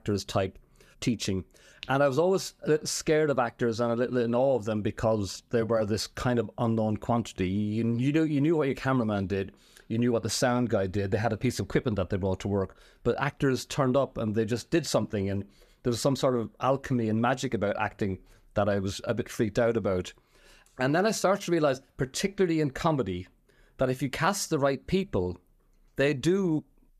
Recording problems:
none

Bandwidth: 14.5 kHz